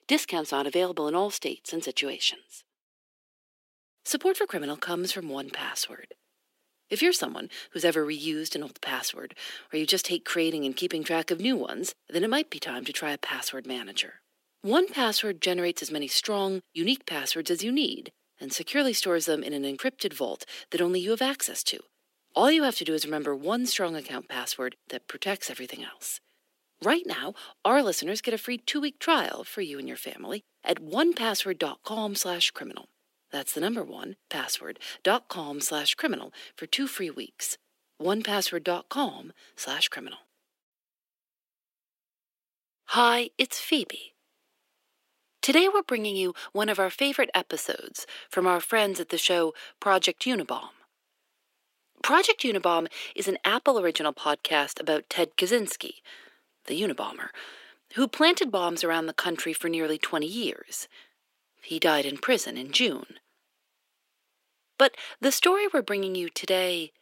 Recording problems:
thin; somewhat; fading below 300 Hz

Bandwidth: 16 kHz